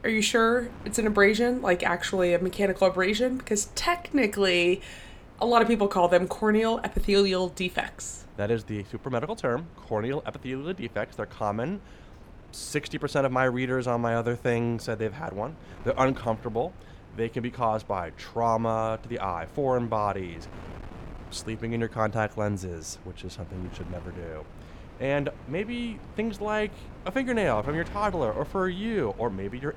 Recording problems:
wind noise on the microphone; occasional gusts; 25 dB below the speech

